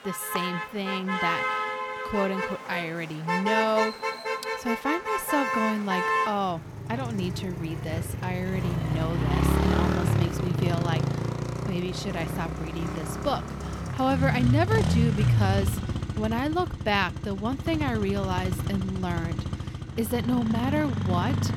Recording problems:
traffic noise; very loud; throughout; 1 dB above the speech

